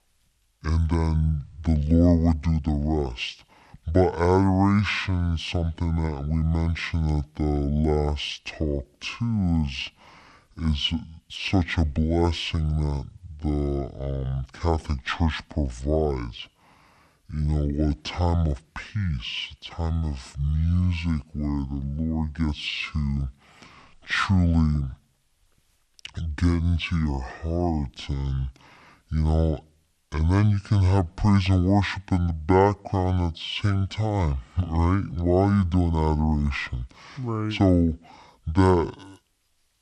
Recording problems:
wrong speed and pitch; too slow and too low; 0.6 times normal speed

